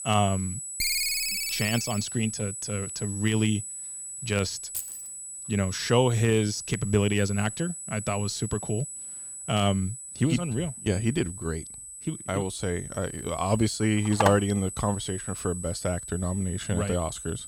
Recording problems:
high-pitched whine; loud; throughout; 8 kHz, 8 dB below the speech
phone ringing; loud; from 1 to 2 s; peak 3 dB above the speech
jangling keys; noticeable; at 4.5 s; peak 7 dB below the speech
phone ringing; noticeable; at 14 s; peak level with the speech

